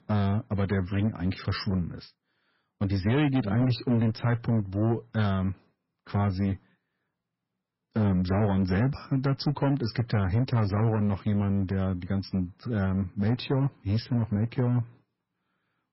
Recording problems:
garbled, watery; badly; nothing above 5.5 kHz
distortion; slight; 10% of the sound clipped

